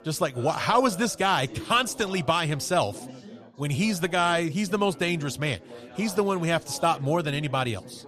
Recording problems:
chatter from many people; noticeable; throughout; 20 dB below the speech

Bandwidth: 14.5 kHz